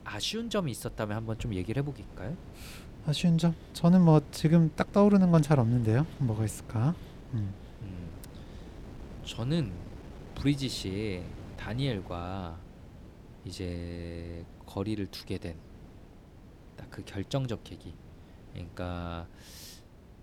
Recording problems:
wind noise on the microphone; occasional gusts; 20 dB below the speech

